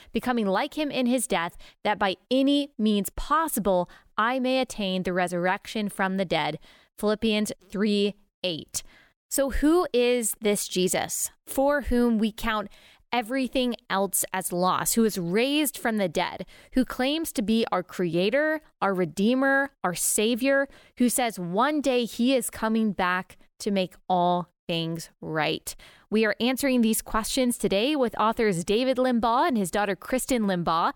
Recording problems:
none

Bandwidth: 17.5 kHz